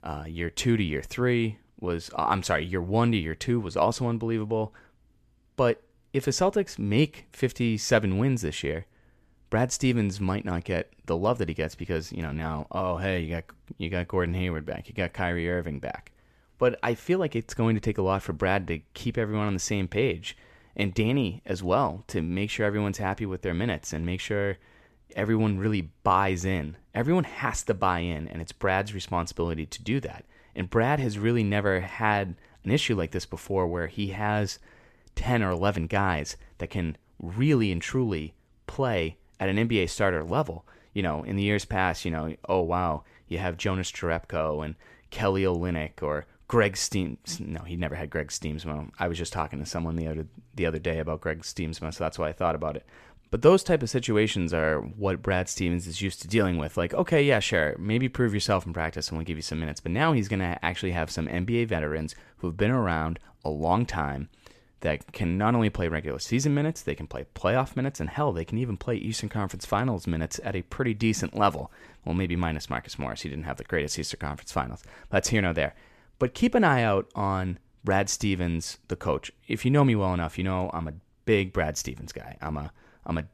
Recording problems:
none

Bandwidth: 14 kHz